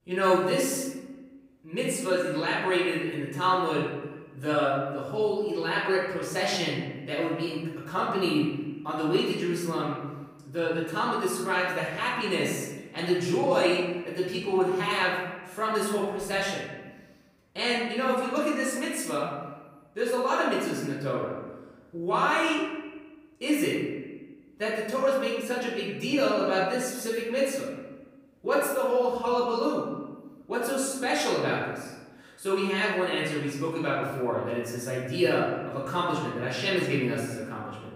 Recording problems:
off-mic speech; far
room echo; noticeable; dies away in 1.1 s

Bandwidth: 15.5 kHz